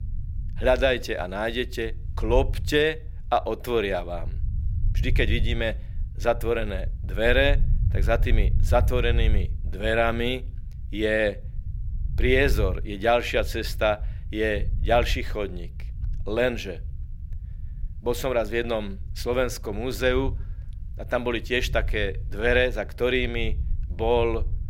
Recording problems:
low rumble; faint; throughout; 25 dB below the speech

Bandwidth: 16 kHz